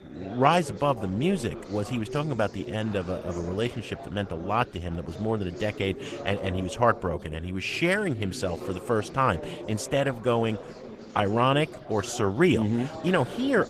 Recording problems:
garbled, watery; slightly; nothing above 14.5 kHz
chatter from many people; noticeable; throughout; 15 dB below the speech

